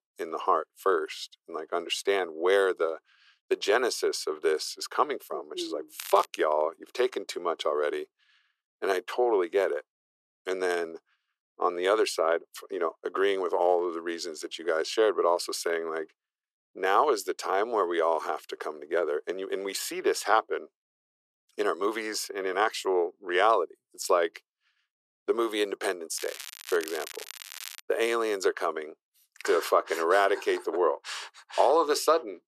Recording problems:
thin; very; fading below 400 Hz
crackling; noticeable; at 6 s and from 26 to 28 s; 15 dB below the speech

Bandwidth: 14 kHz